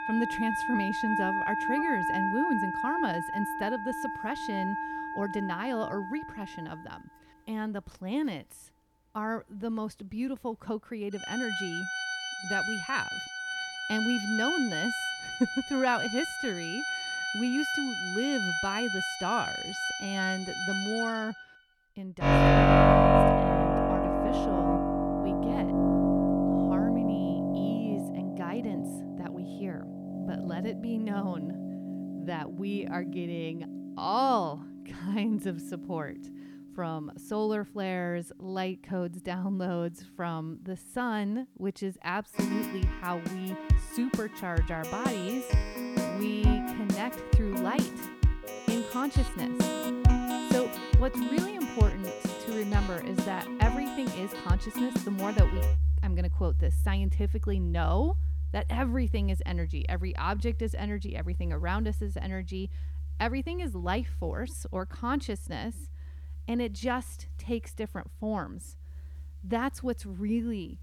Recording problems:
background music; very loud; throughout; 4 dB above the speech

